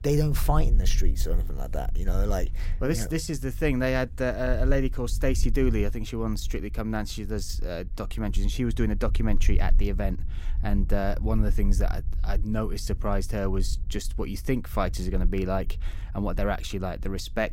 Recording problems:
low rumble; faint; throughout; 20 dB below the speech

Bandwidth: 16 kHz